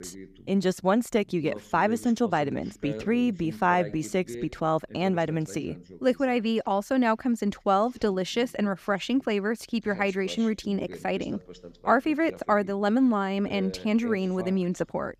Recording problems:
voice in the background; noticeable; throughout; 15 dB below the speech

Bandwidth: 14.5 kHz